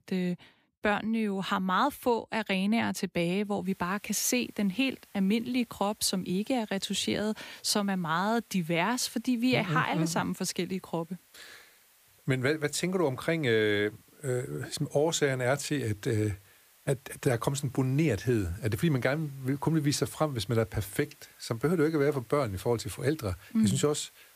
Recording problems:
hiss; faint; from 3.5 s on; 30 dB below the speech

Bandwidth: 15 kHz